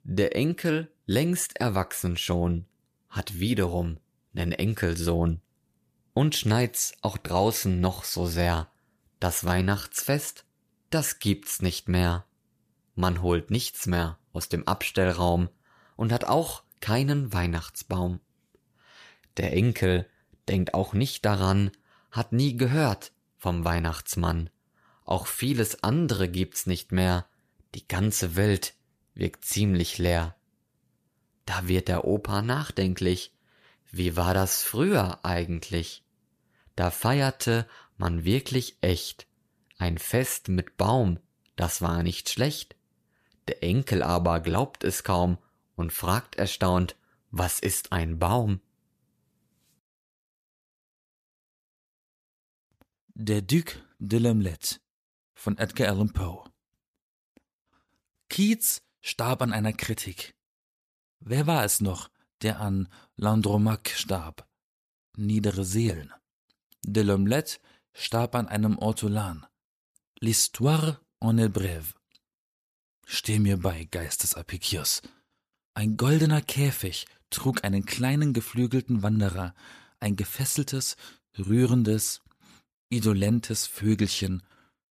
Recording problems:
none

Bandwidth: 14.5 kHz